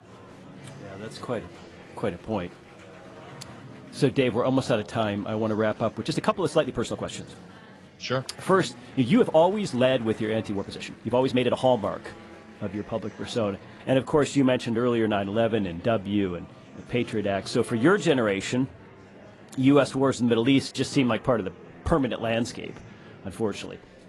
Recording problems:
garbled, watery; slightly; nothing above 11 kHz
murmuring crowd; faint; throughout; 20 dB below the speech
uneven, jittery; strongly; from 6 to 12 s

